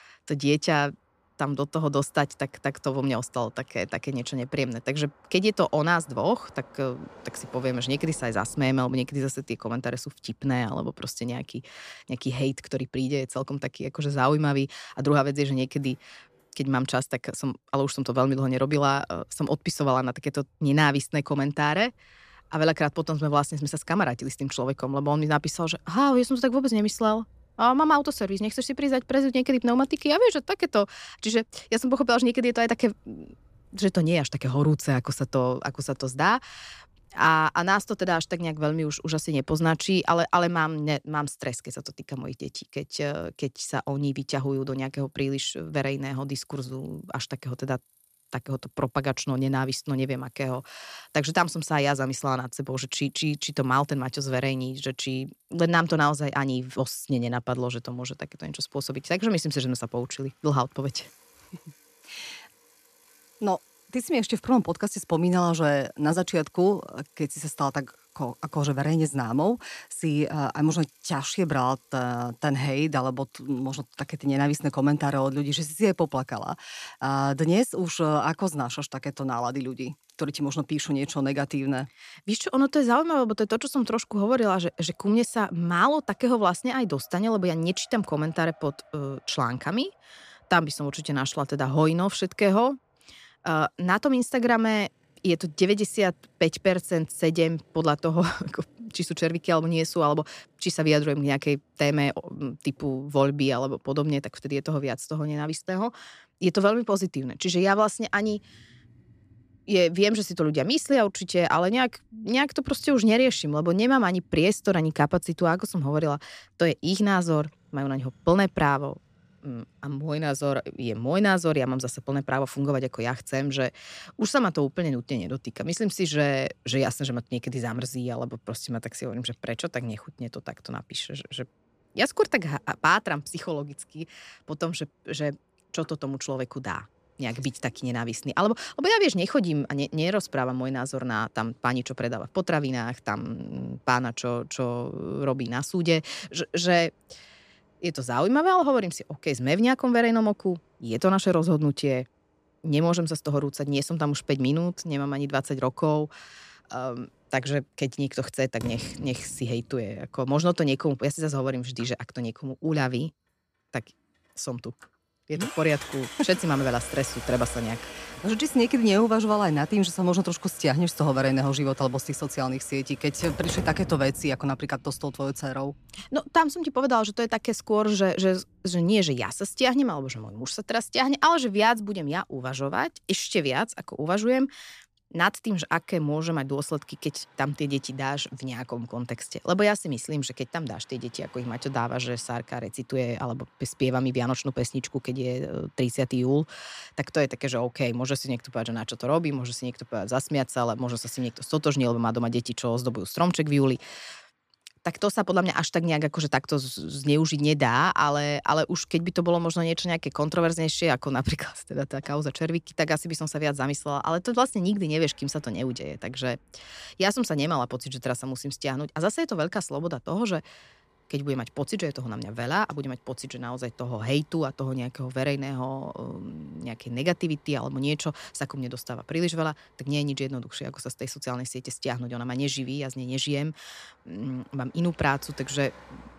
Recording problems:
traffic noise; faint; throughout; 25 dB below the speech

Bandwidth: 14.5 kHz